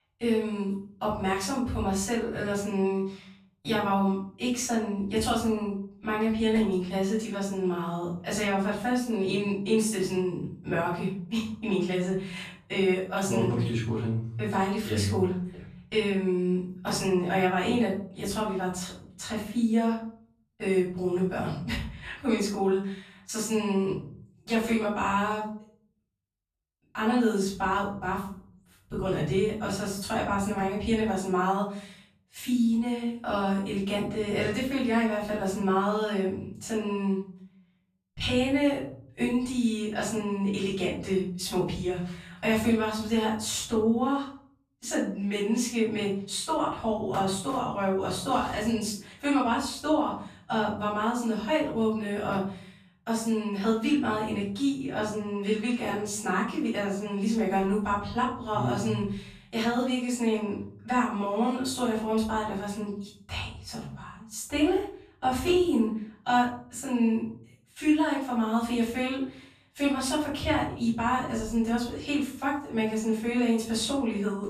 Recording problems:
off-mic speech; far
room echo; noticeable; dies away in 0.6 s

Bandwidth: 14.5 kHz